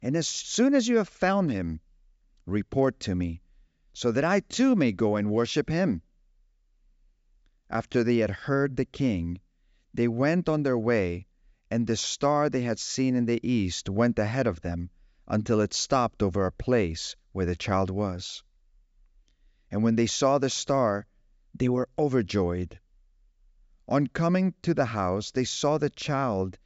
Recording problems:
high frequencies cut off; noticeable; nothing above 8 kHz

